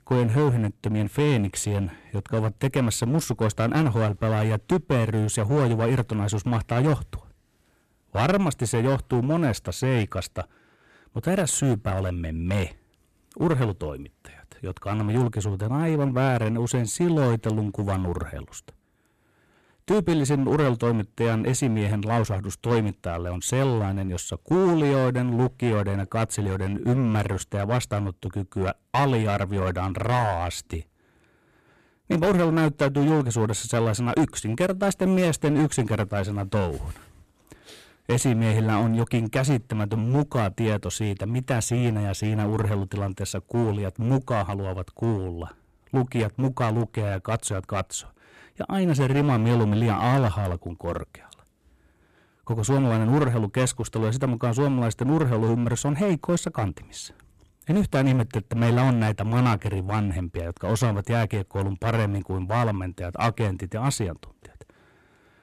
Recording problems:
distortion; slight; 10% of the sound clipped

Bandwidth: 14.5 kHz